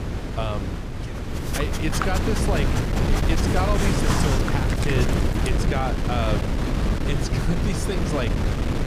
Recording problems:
wind noise on the microphone; heavy; as loud as the speech
dog barking; loud; from 1.5 to 5.5 s; peak 2 dB above the speech

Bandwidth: 15 kHz